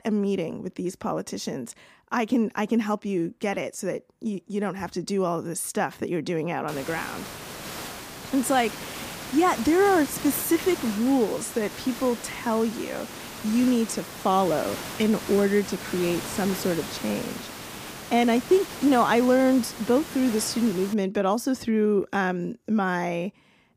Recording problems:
hiss; noticeable; from 6.5 to 21 s; 10 dB below the speech

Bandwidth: 15 kHz